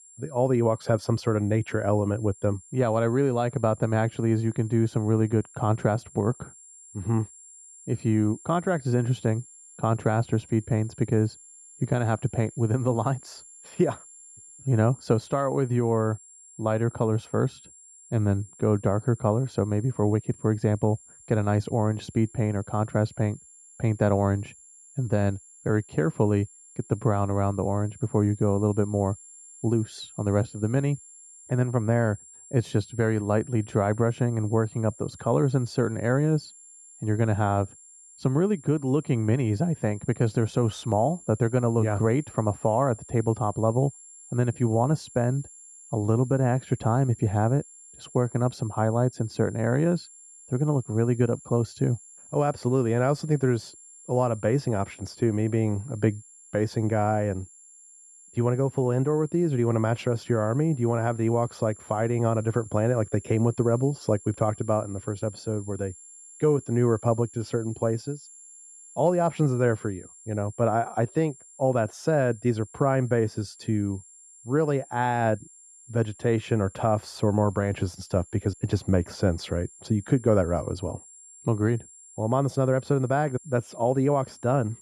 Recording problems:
muffled; very; fading above 2 kHz
high-pitched whine; faint; throughout; 7.5 kHz, 20 dB below the speech

